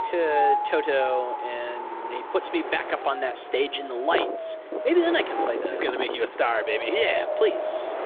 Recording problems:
phone-call audio; nothing above 3.5 kHz
wind in the background; loud; throughout; 4 dB below the speech

